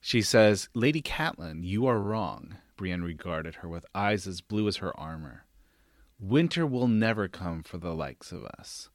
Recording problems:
uneven, jittery; strongly; from 0.5 to 8.5 s

